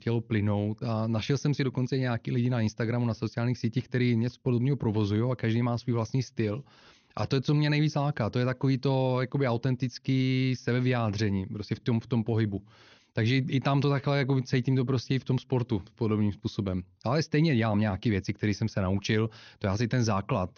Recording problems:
high frequencies cut off; noticeable; nothing above 6.5 kHz

